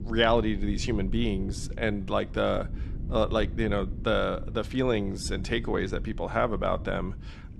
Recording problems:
low rumble; faint; throughout; 20 dB below the speech

